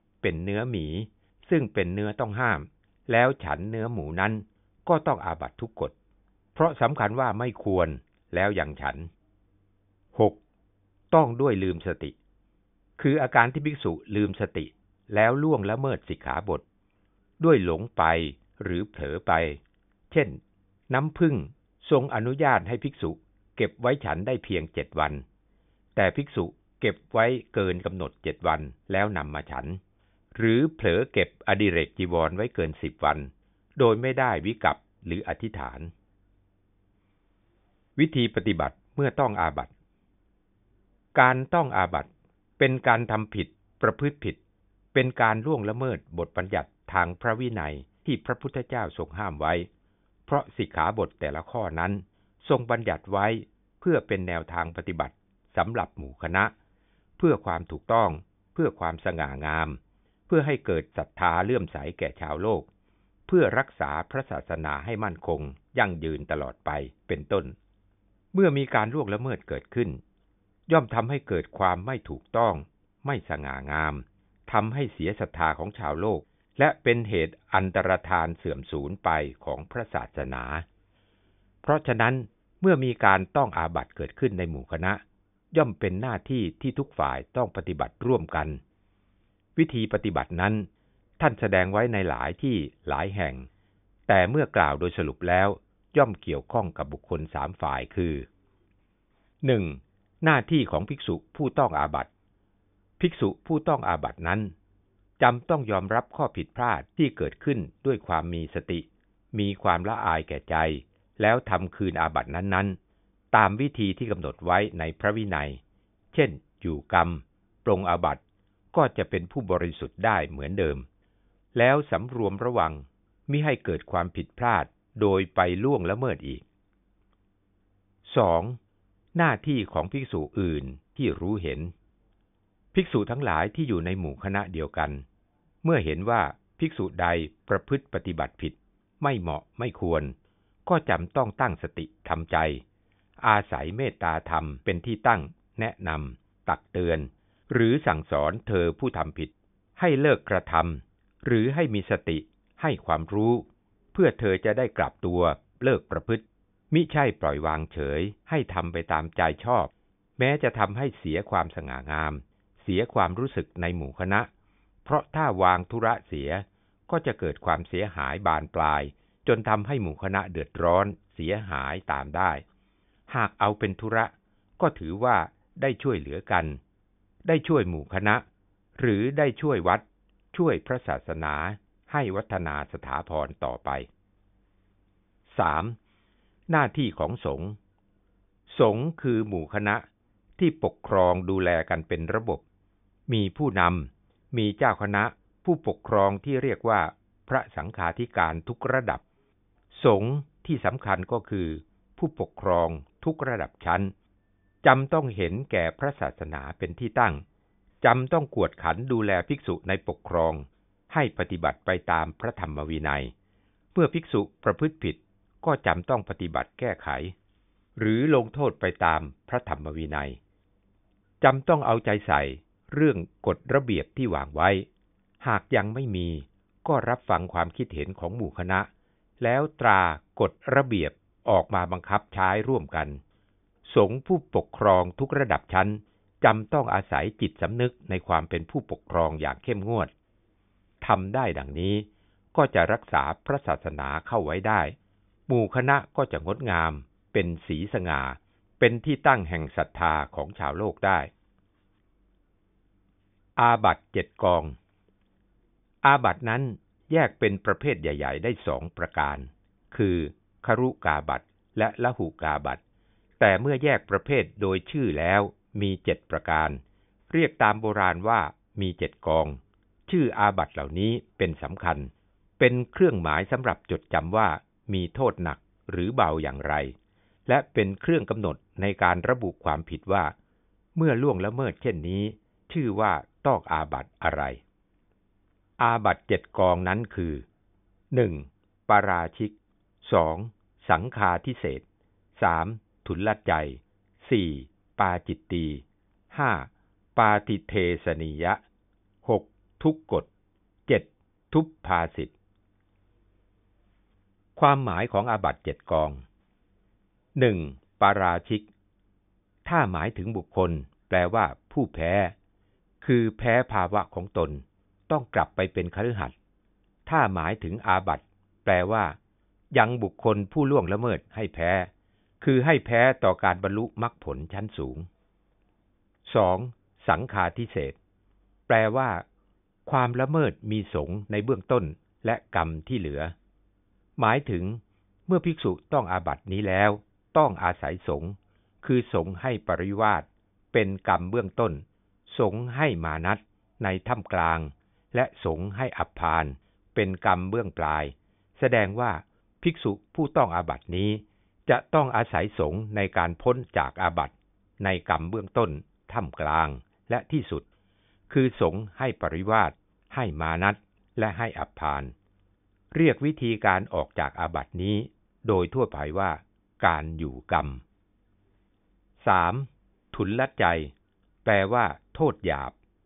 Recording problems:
high frequencies cut off; severe; nothing above 3.5 kHz

